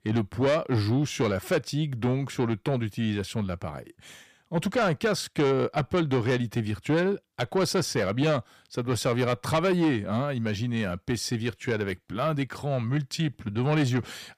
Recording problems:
distortion; slight; 10 dB below the speech

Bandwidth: 15 kHz